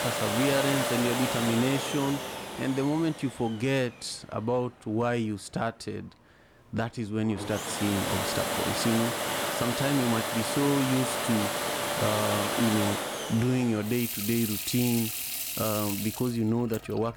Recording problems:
household noises; loud; throughout; 1 dB below the speech

